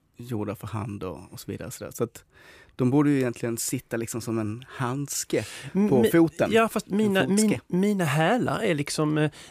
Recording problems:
none

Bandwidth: 15 kHz